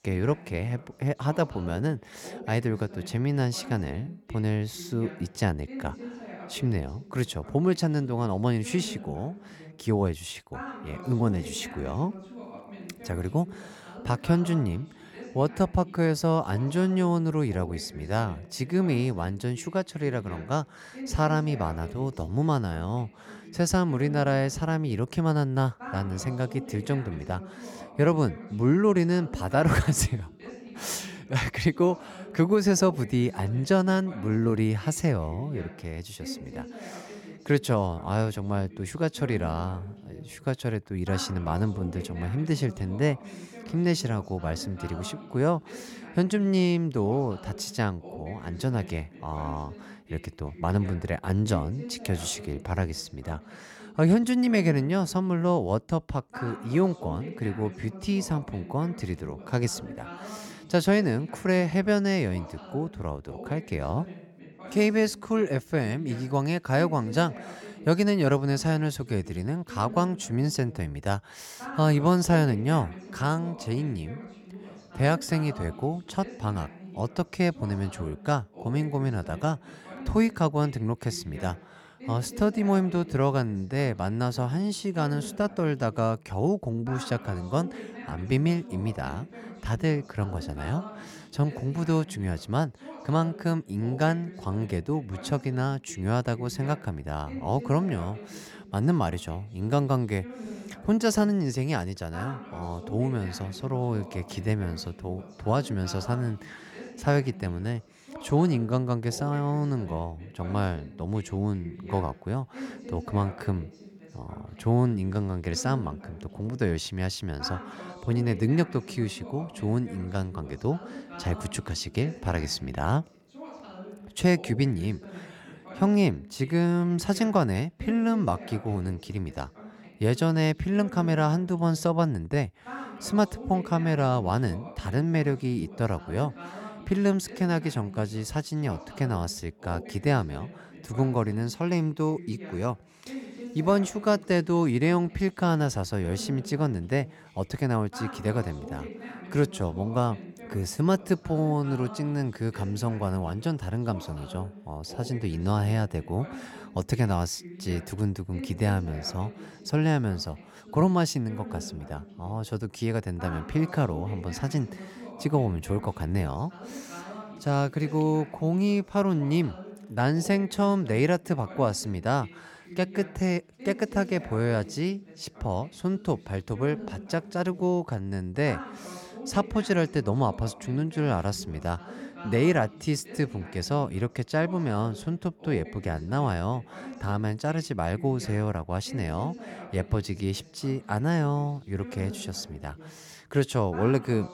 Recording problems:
voice in the background; noticeable; throughout; 15 dB below the speech

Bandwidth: 17.5 kHz